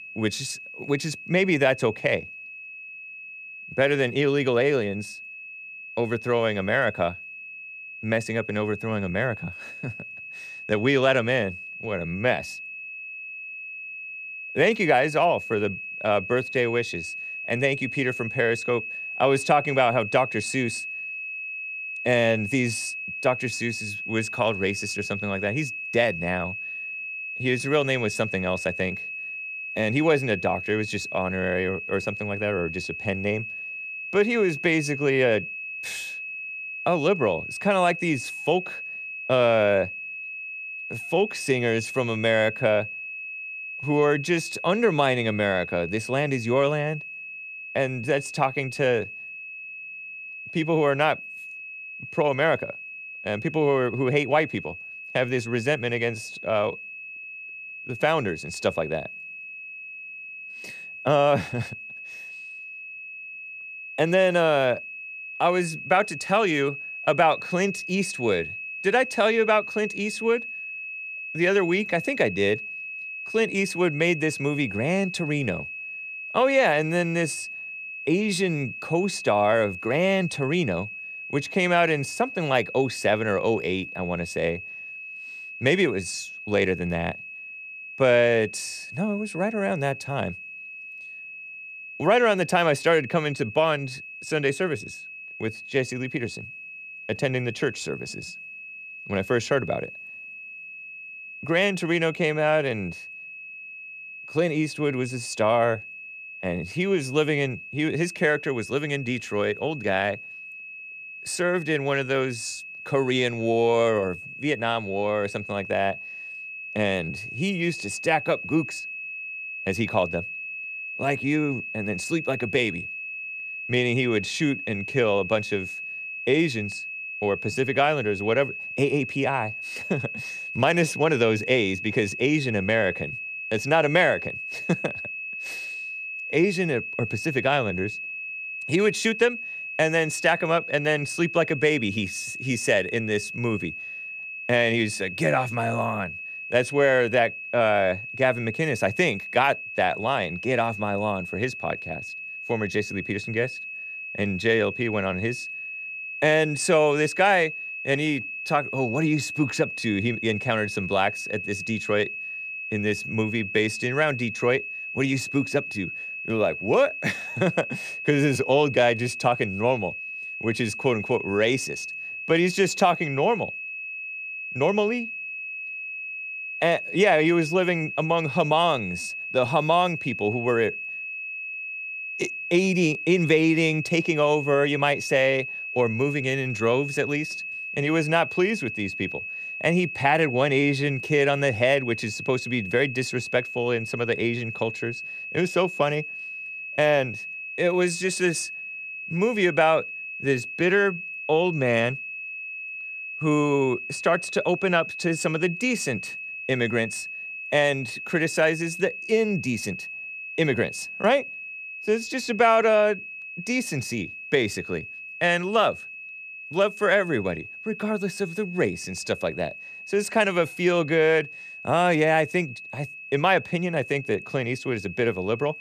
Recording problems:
high-pitched whine; loud; throughout; 2.5 kHz, 9 dB below the speech

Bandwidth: 14.5 kHz